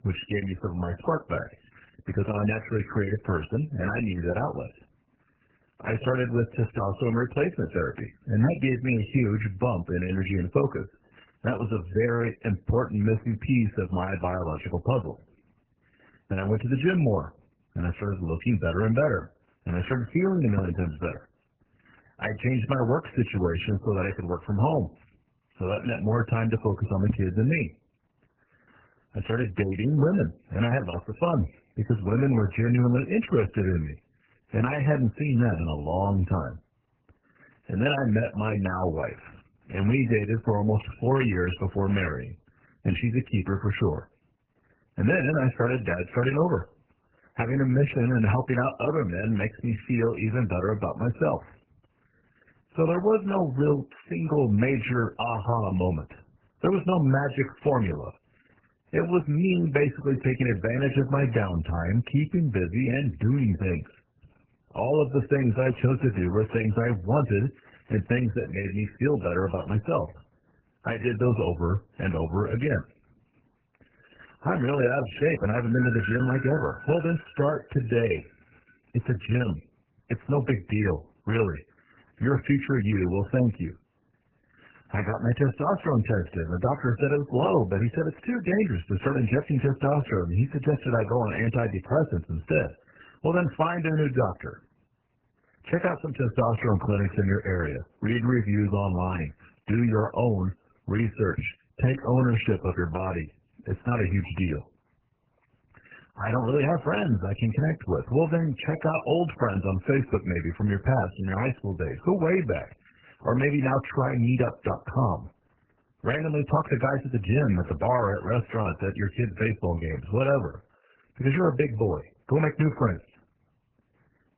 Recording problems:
garbled, watery; badly; nothing above 3 kHz
doorbell; noticeable; from 1:15 to 1:17; peak 6 dB below the speech

